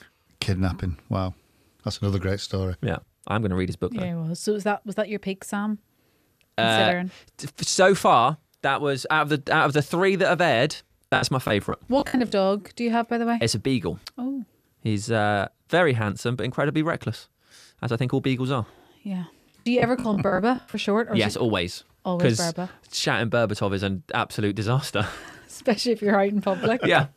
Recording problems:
choppy; very; from 11 to 12 s and from 20 to 21 s; 19% of the speech affected

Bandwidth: 14.5 kHz